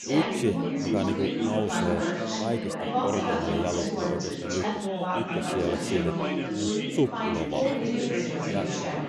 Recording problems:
chatter from many people; very loud; throughout; 3 dB above the speech

